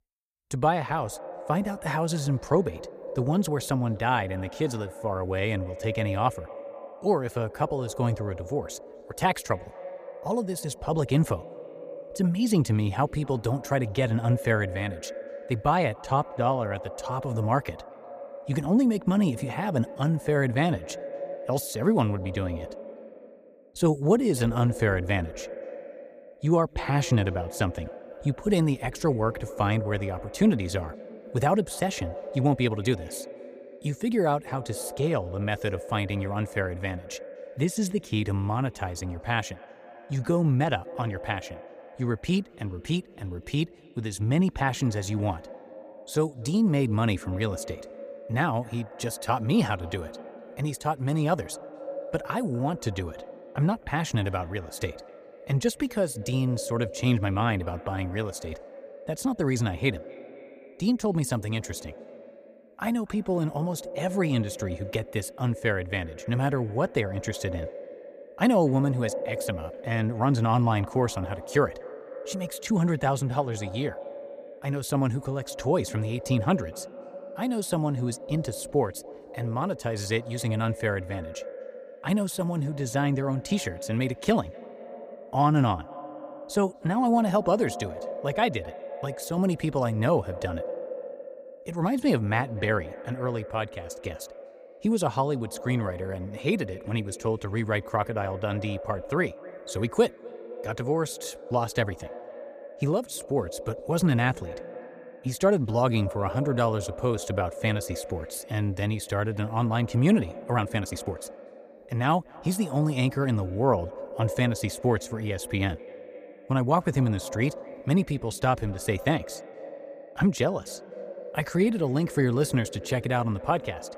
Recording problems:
echo of what is said; noticeable; throughout; 250 ms later, 15 dB below the speech
uneven, jittery; strongly; from 16 s to 1:51

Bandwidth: 15 kHz